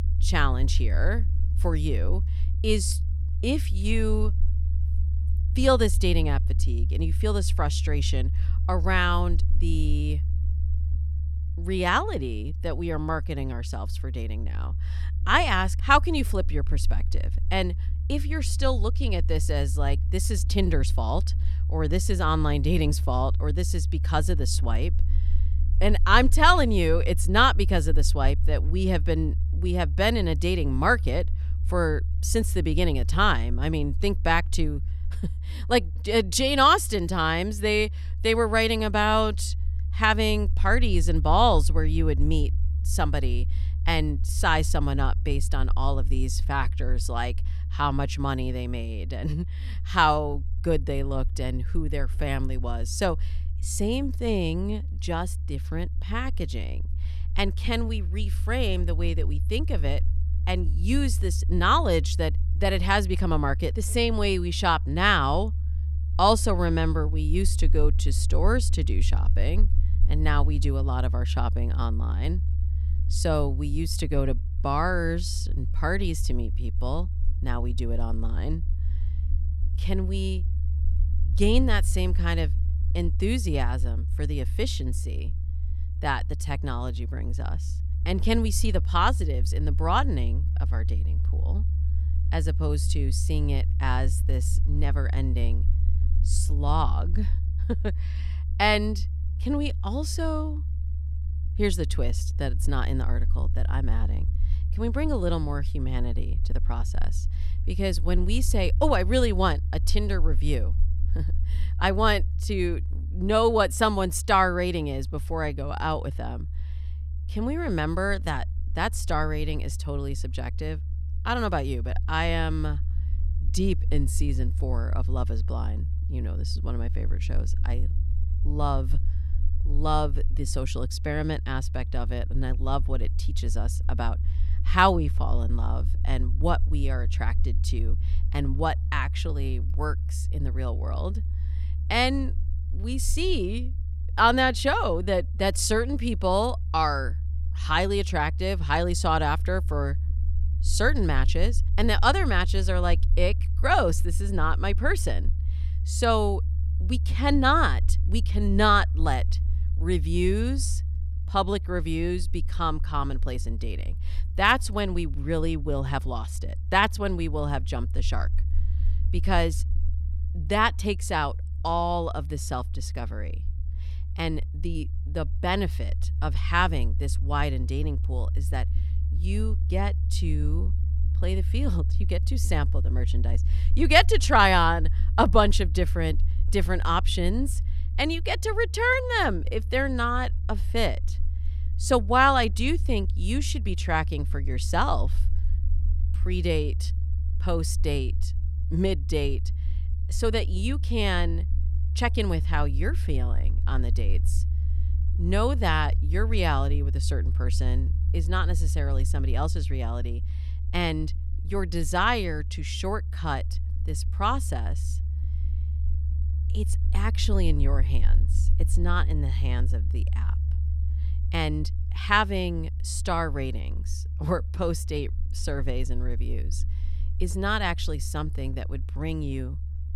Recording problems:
low rumble; faint; throughout; 20 dB below the speech

